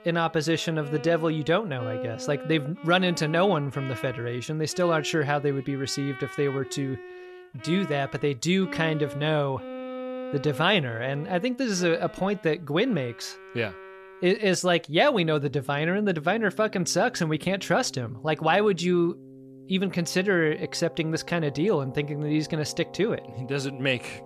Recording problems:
background music; noticeable; throughout; 15 dB below the speech

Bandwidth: 14.5 kHz